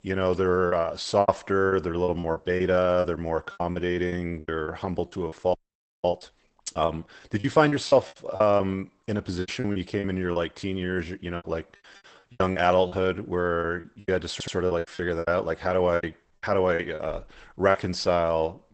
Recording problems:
garbled, watery; badly; nothing above 8 kHz
choppy; very; 14% of the speech affected
audio freezing; at 5.5 s for 0.5 s
audio stuttering; at 14 s

